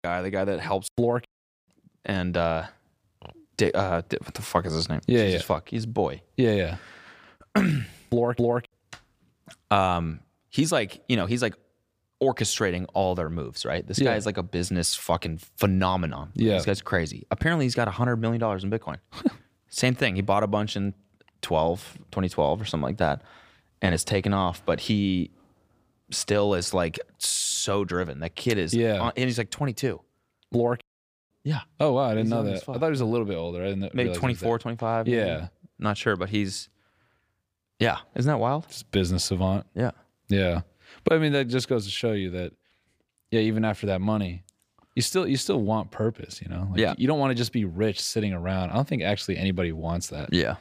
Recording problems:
none

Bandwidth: 15 kHz